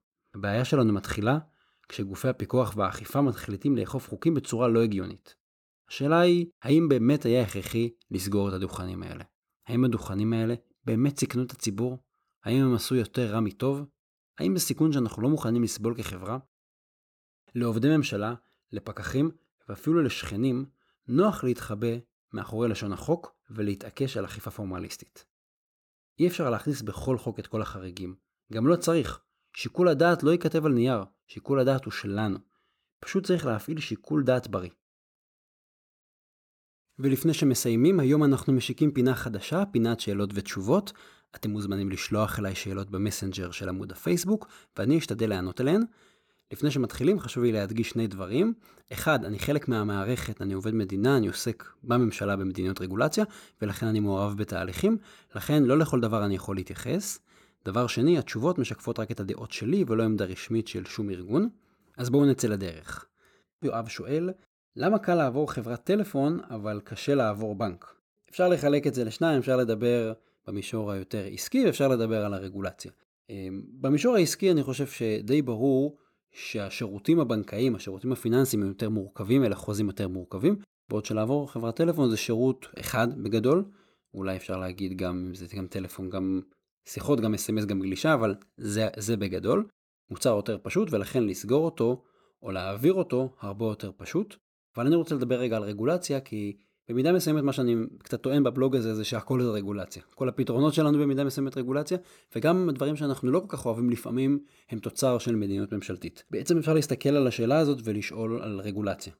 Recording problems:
none

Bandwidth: 17 kHz